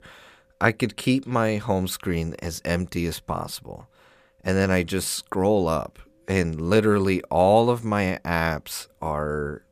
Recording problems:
none

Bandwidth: 14.5 kHz